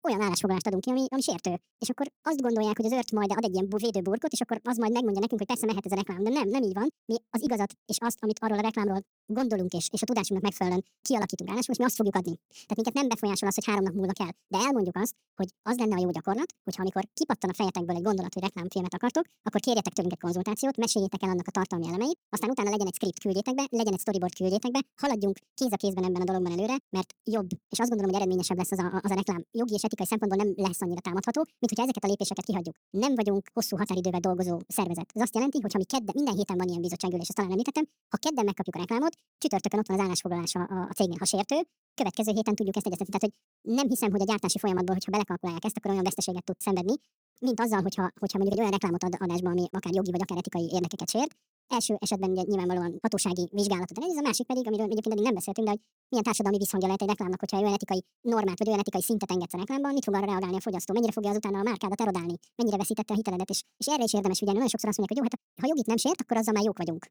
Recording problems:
wrong speed and pitch; too fast and too high; 1.6 times normal speed

